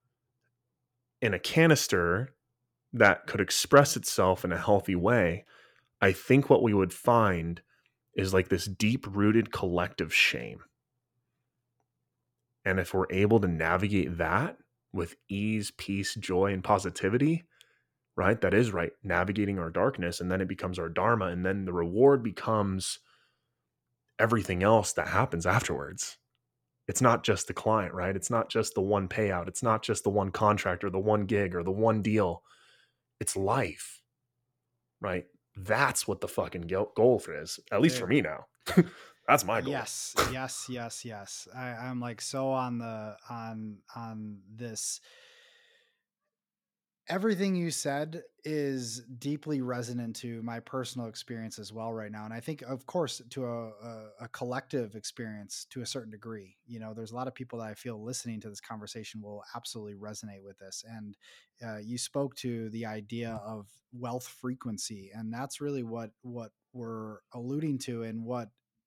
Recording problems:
none

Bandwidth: 17 kHz